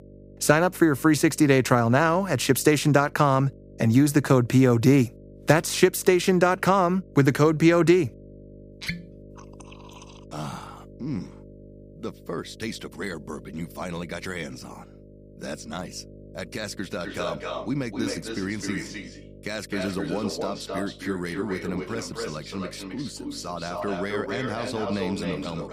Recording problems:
echo of what is said; strong; from 17 s on; 260 ms later, 10 dB below the speech
electrical hum; faint; throughout; 50 Hz, 25 dB below the speech

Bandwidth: 15 kHz